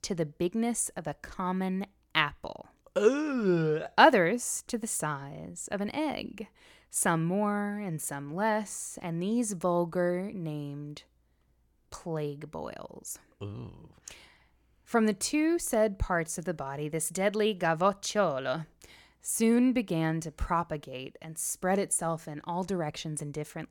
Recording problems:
none

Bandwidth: 17.5 kHz